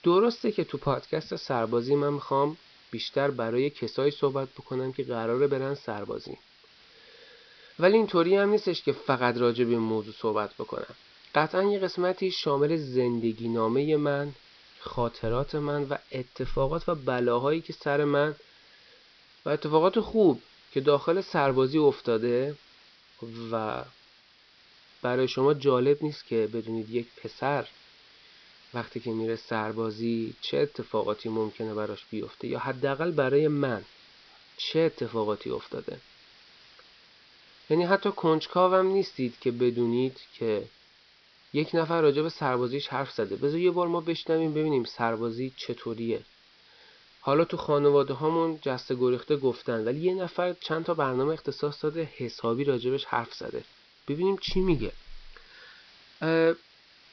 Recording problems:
high frequencies cut off; noticeable; nothing above 5.5 kHz
hiss; faint; throughout; 25 dB below the speech

